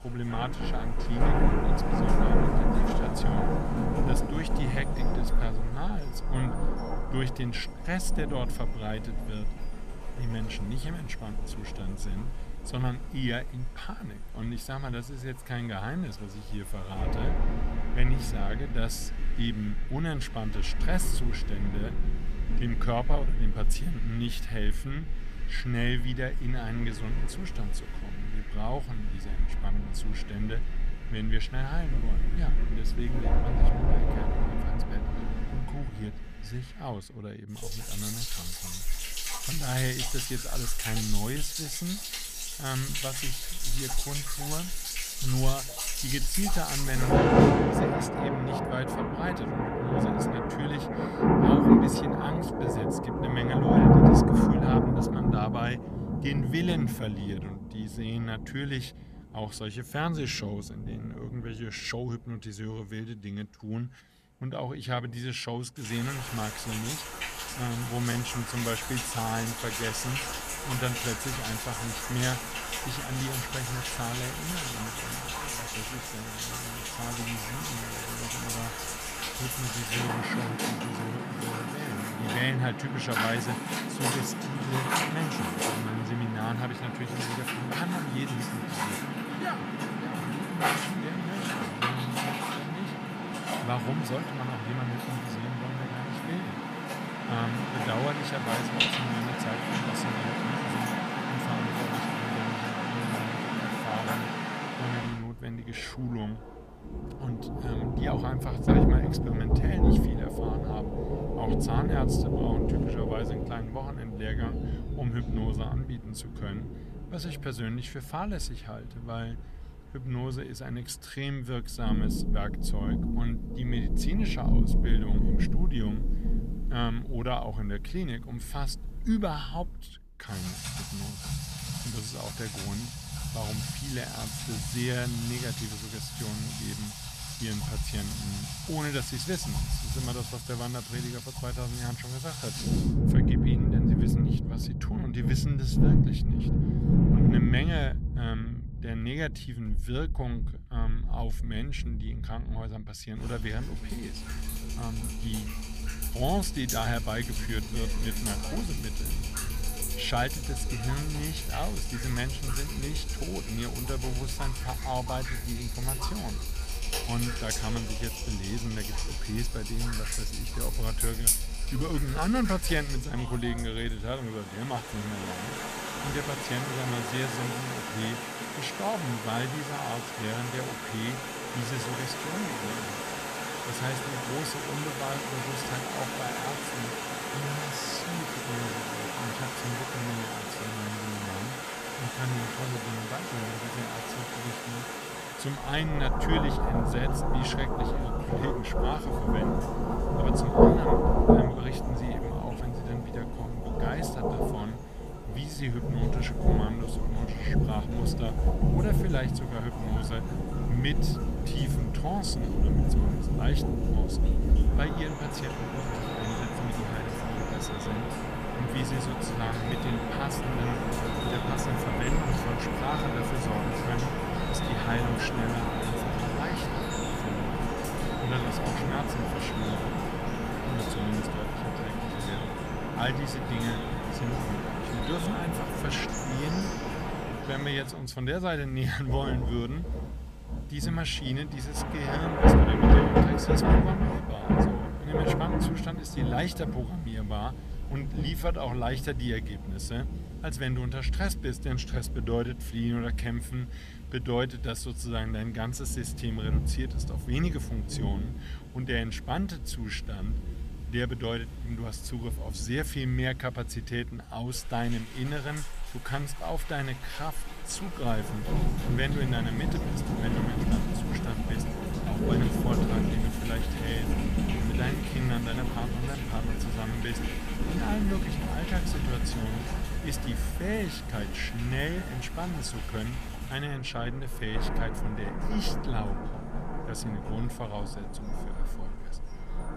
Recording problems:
rain or running water; very loud; throughout; 4 dB above the speech

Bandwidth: 14.5 kHz